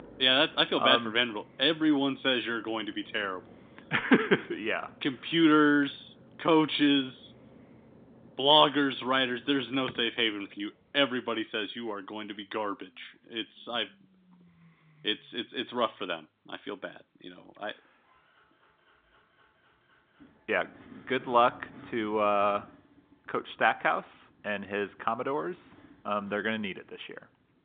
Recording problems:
phone-call audio; nothing above 3.5 kHz
traffic noise; faint; throughout; 25 dB below the speech

